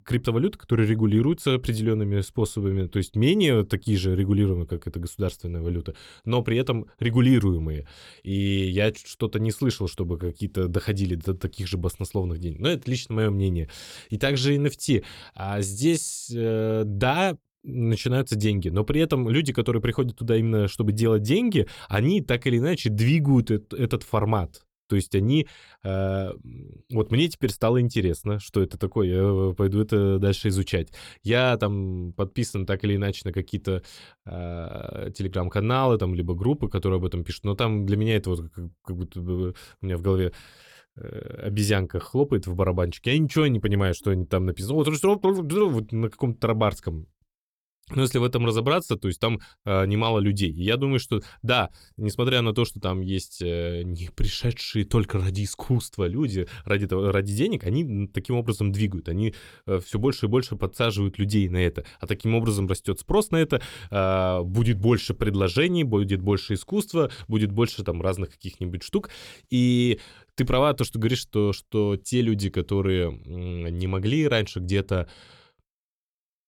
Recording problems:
none

